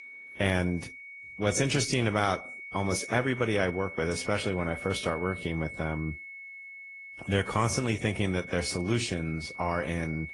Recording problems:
garbled, watery; slightly; nothing above 10.5 kHz
high-pitched whine; noticeable; throughout; 2 kHz, 10 dB below the speech

